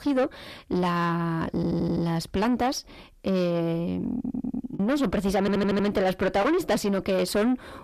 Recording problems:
distortion; heavy; 6 dB below the speech
audio stuttering; at 1.5 s, at 4 s and at 5.5 s
choppy; occasionally; at 5 s; 1% of the speech affected

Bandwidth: 14 kHz